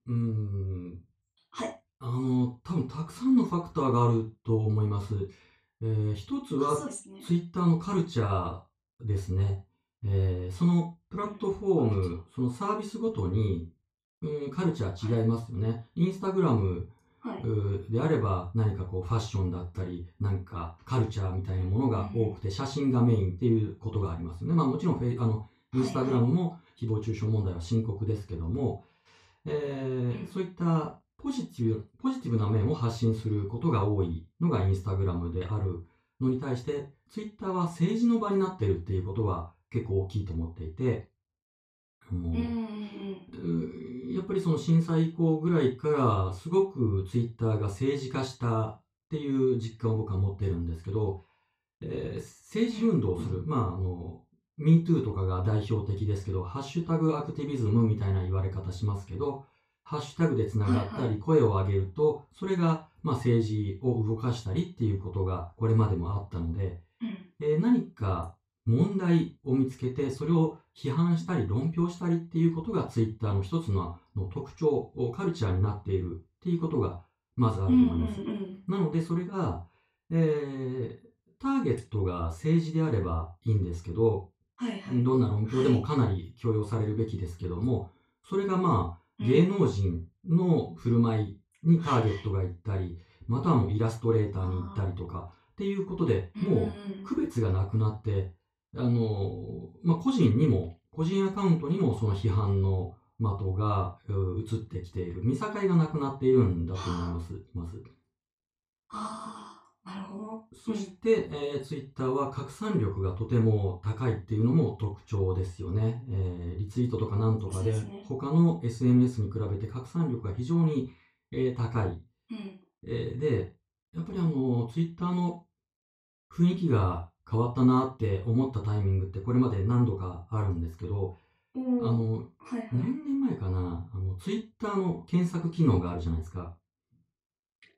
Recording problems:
off-mic speech; far
room echo; slight; dies away in 0.2 s

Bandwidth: 14.5 kHz